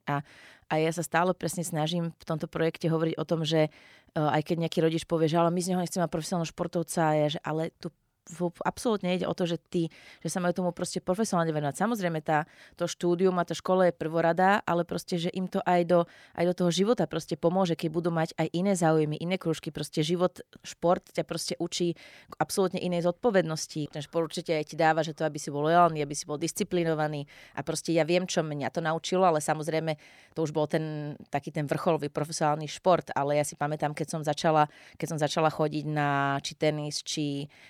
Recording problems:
none

